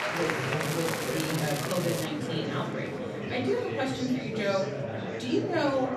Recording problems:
off-mic speech; far
echo of what is said; noticeable; throughout; 90 ms later, 15 dB below the speech
room echo; slight; dies away in 0.4 s
murmuring crowd; loud; throughout; 1 dB below the speech
crackling; loud; from 0.5 to 2 s; 6 dB below the speech

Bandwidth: 14 kHz